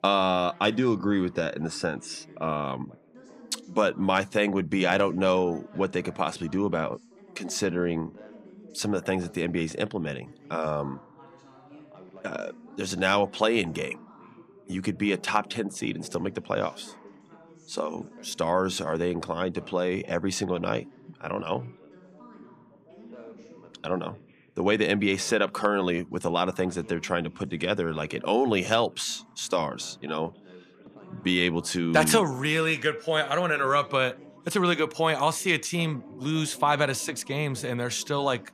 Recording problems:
background chatter; faint; throughout; 3 voices, 20 dB below the speech

